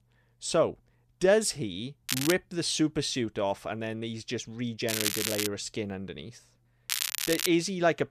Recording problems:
crackling; loud; at 2 s, at 5 s and at 7 s; 1 dB below the speech

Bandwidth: 14.5 kHz